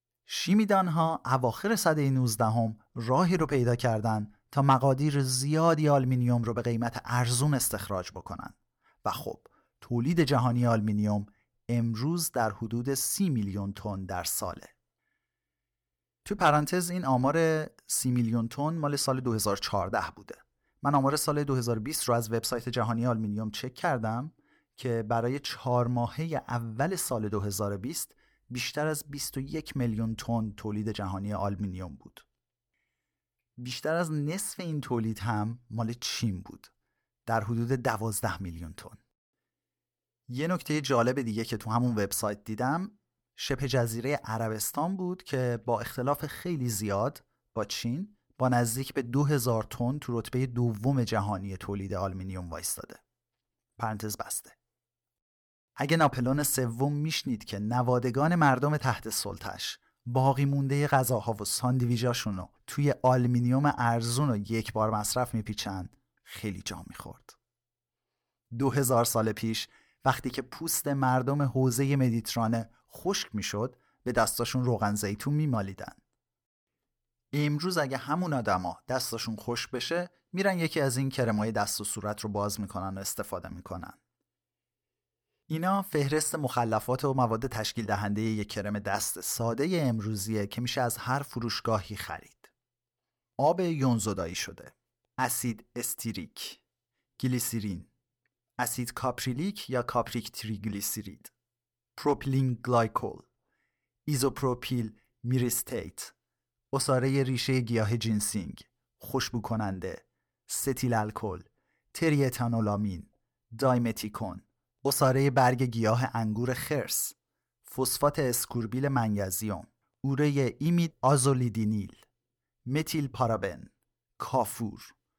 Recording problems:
none

